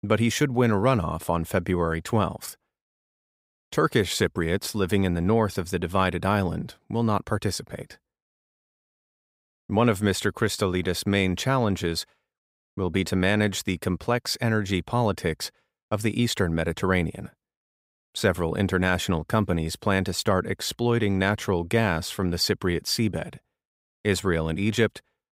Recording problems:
none

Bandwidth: 15.5 kHz